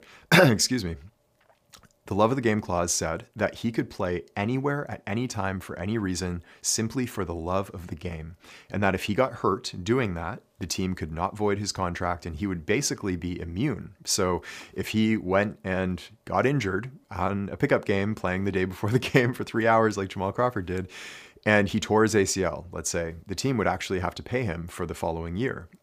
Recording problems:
none

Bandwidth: 15 kHz